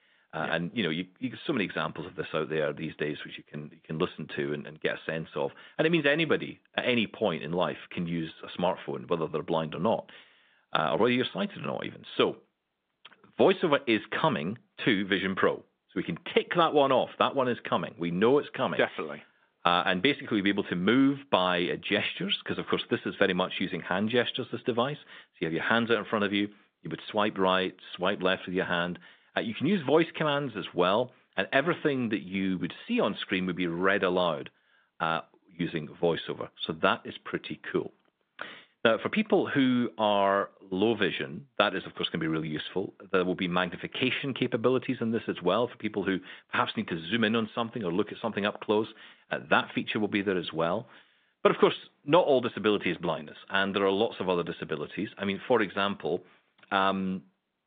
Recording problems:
phone-call audio; nothing above 3.5 kHz

